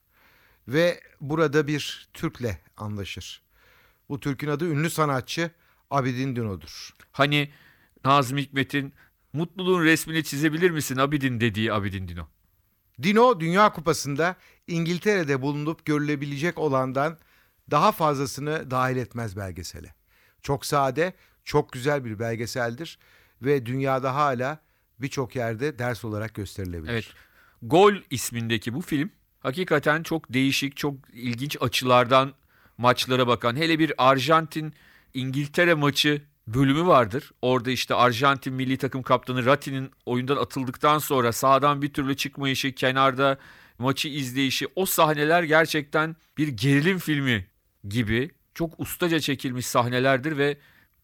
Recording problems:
none

